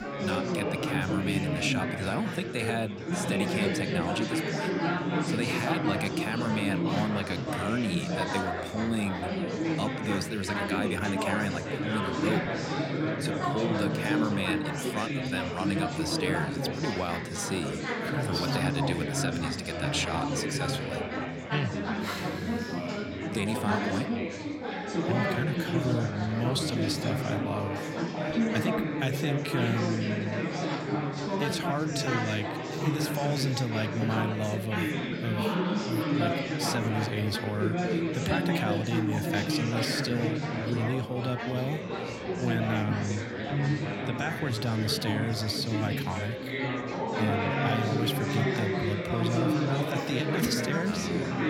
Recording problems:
chatter from many people; very loud; throughout; 2 dB above the speech

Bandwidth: 16.5 kHz